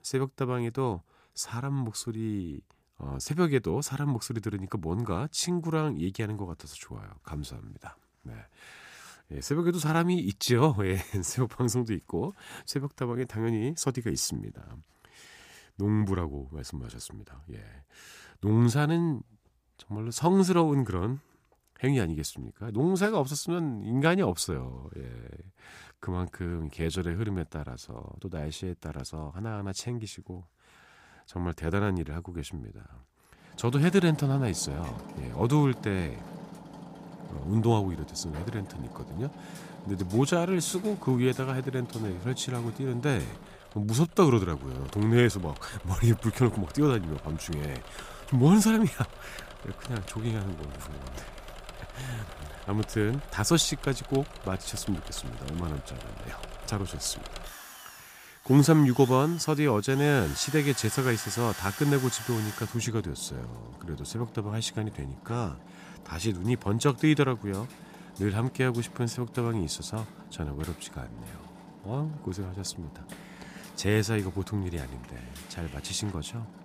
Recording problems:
machinery noise; noticeable; from 34 s on; 15 dB below the speech

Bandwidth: 15 kHz